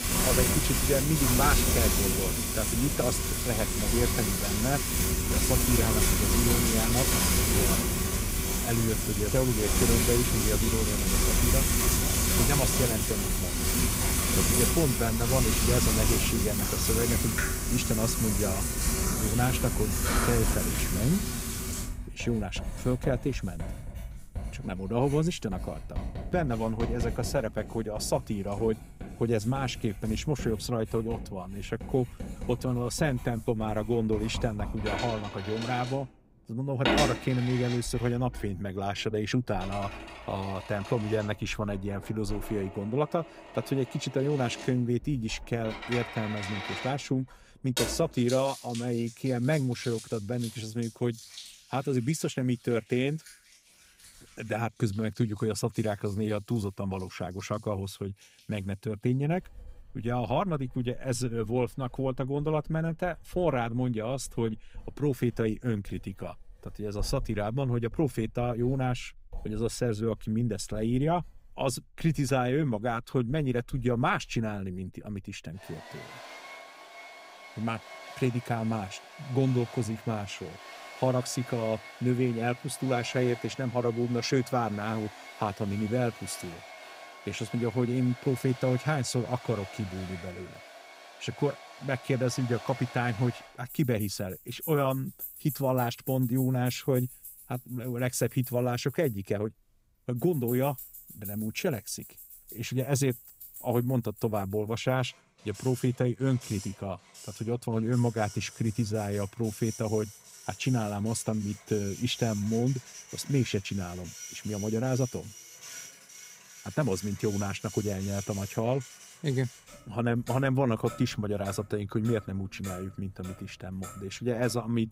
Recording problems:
household noises; very loud; throughout; 1 dB above the speech

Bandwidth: 15.5 kHz